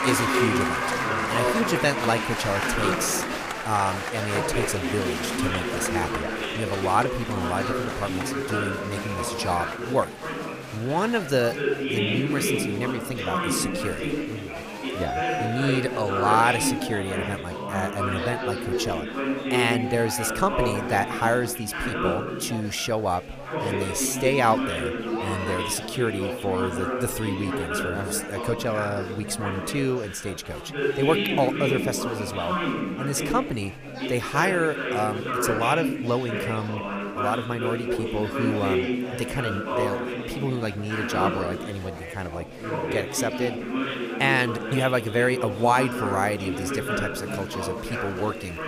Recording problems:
chatter from many people; loud; throughout; 1 dB below the speech

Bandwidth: 15 kHz